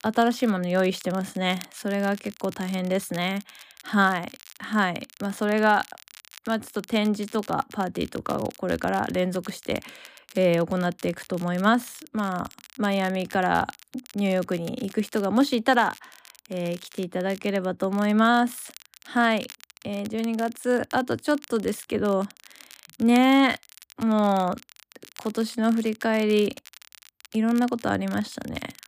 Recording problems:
crackle, like an old record; faint; 20 dB below the speech

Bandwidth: 15 kHz